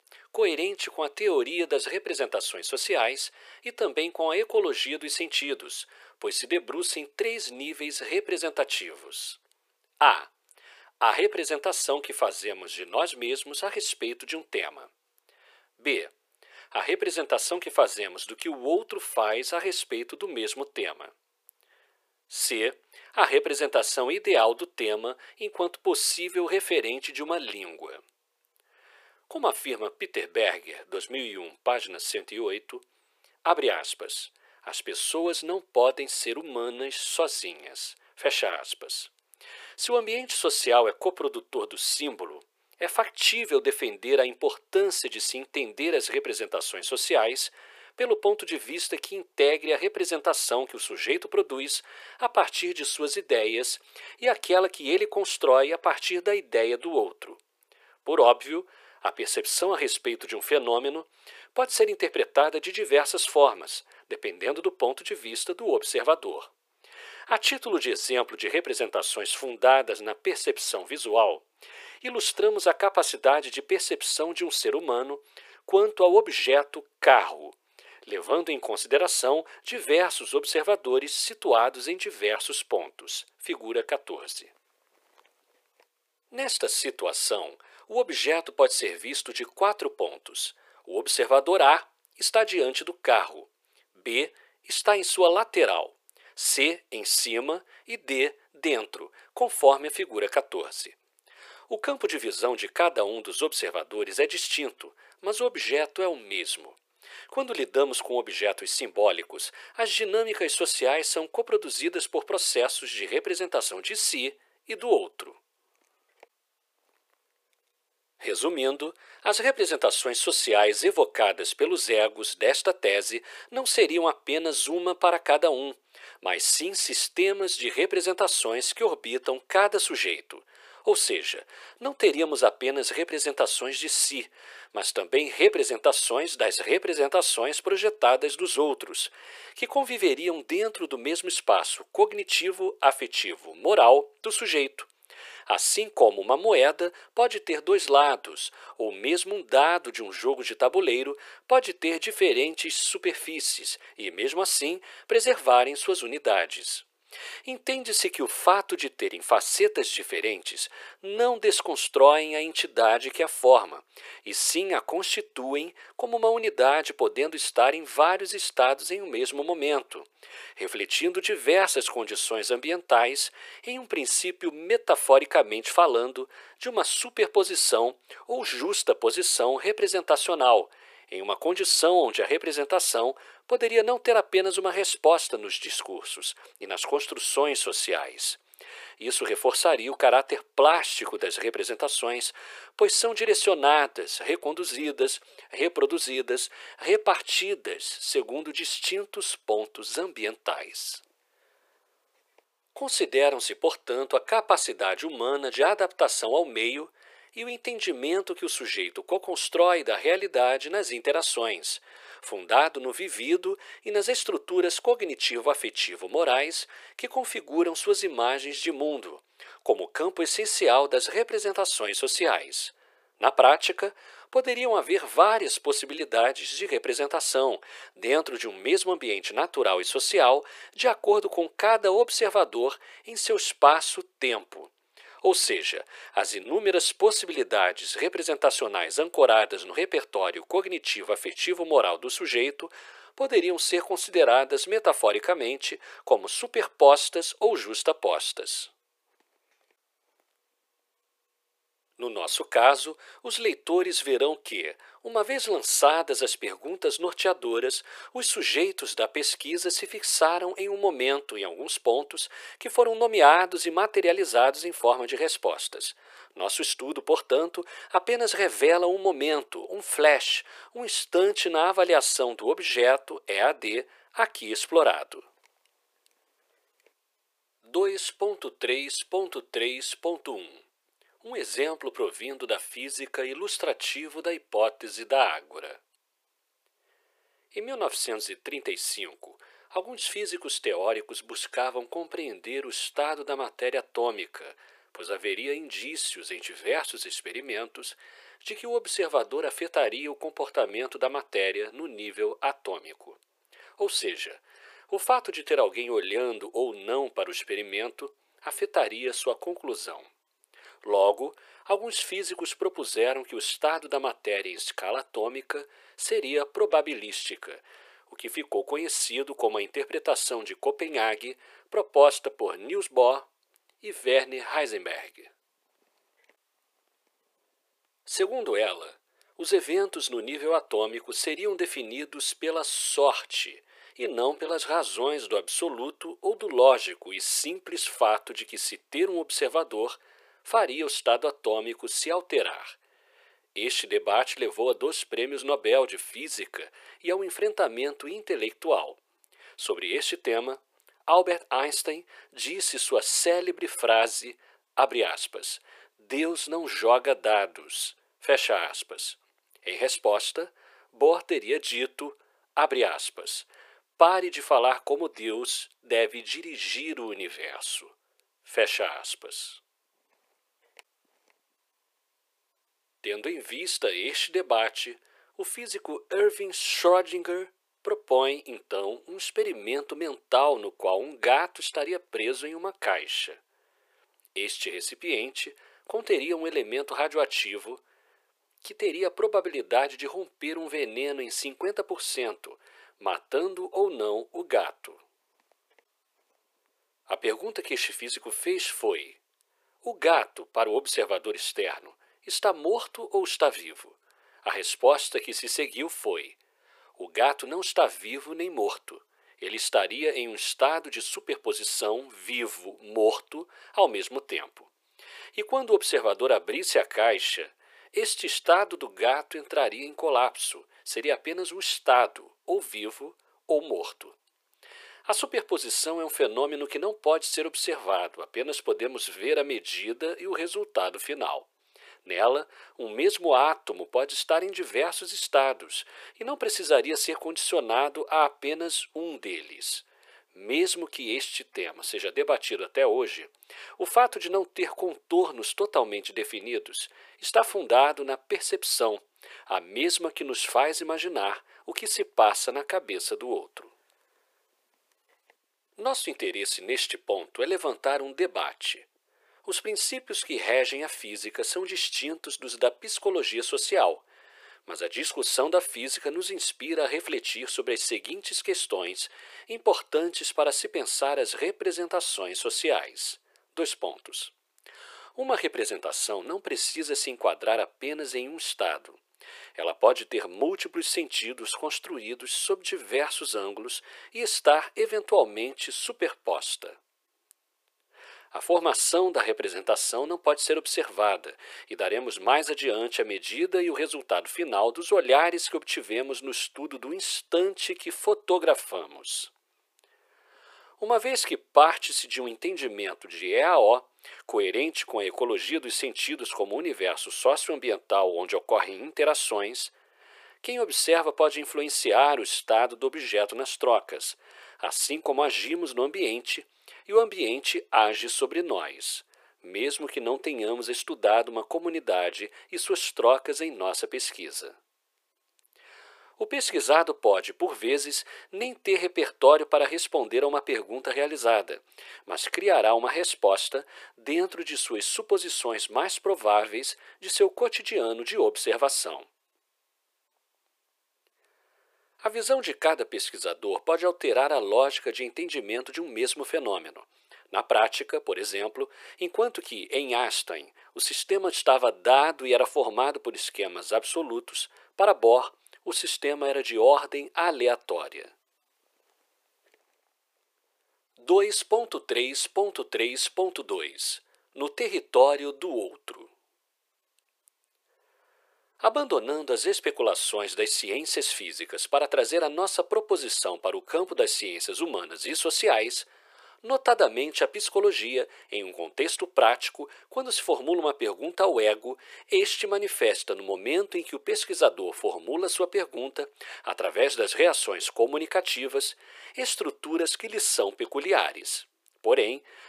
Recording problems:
thin; very; fading below 400 Hz

